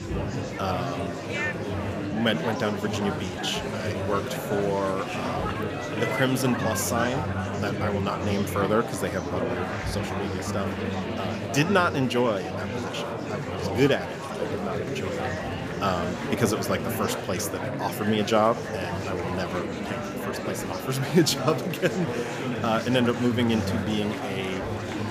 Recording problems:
murmuring crowd; loud; throughout; 3 dB below the speech

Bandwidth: 15 kHz